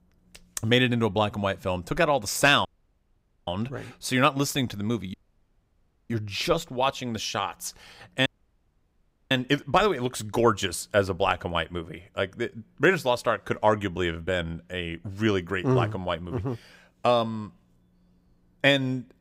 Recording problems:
audio cutting out; at 2.5 s for 1 s, at 5 s for 1 s and at 8.5 s for 1 s

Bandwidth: 15.5 kHz